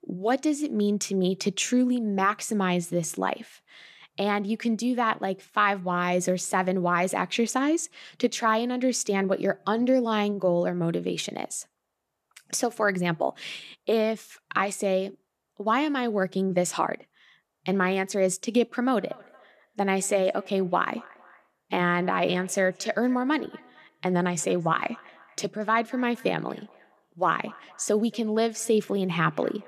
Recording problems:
echo of what is said; faint; from 19 s on; 230 ms later, 25 dB below the speech

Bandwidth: 14 kHz